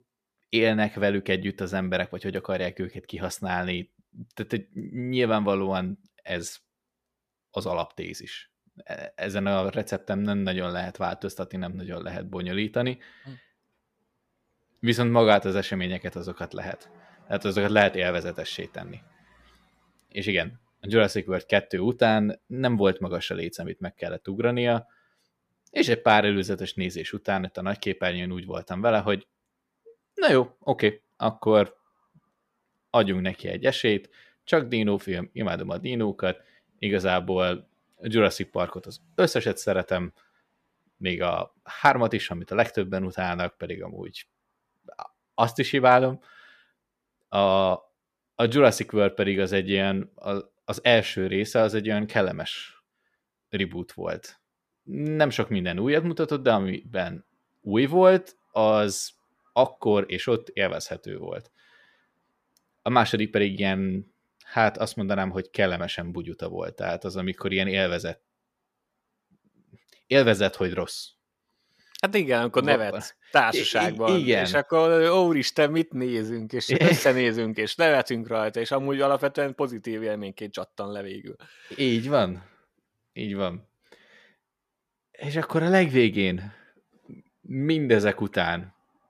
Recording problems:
none

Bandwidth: 14.5 kHz